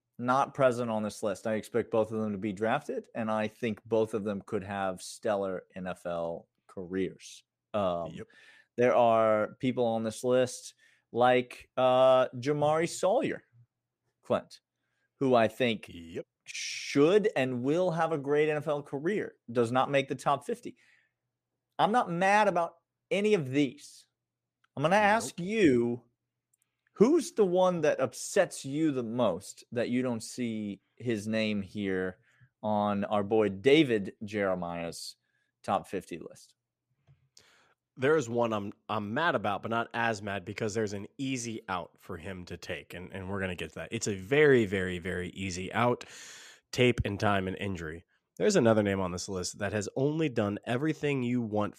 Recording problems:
none

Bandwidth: 14.5 kHz